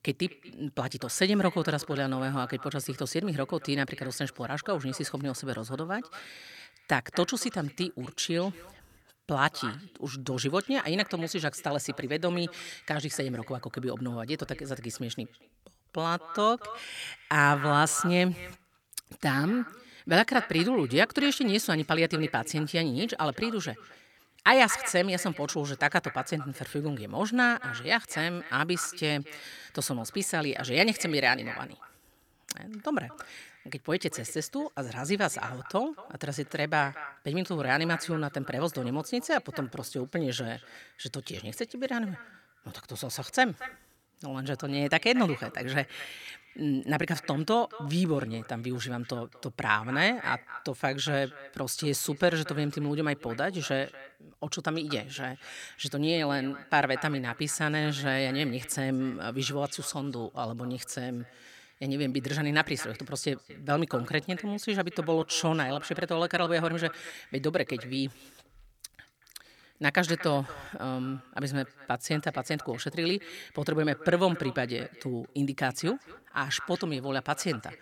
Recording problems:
echo of what is said; noticeable; throughout; 230 ms later, 15 dB below the speech

